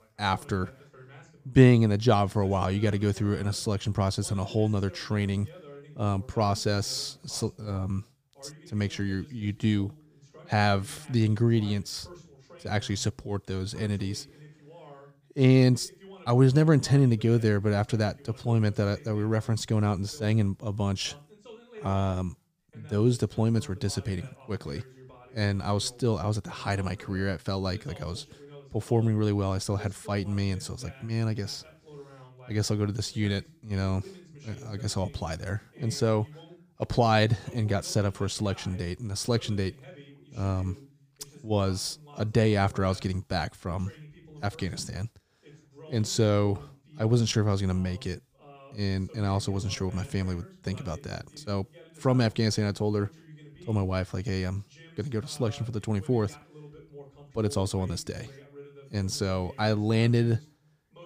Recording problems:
voice in the background; faint; throughout; 20 dB below the speech

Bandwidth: 15 kHz